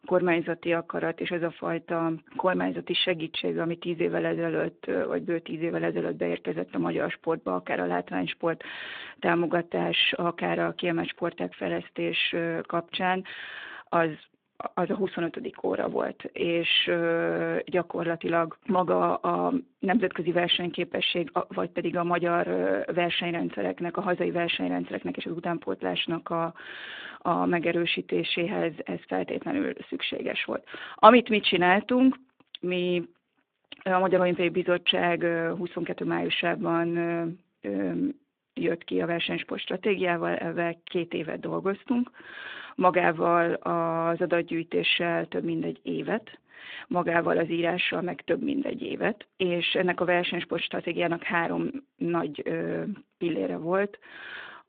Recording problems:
phone-call audio

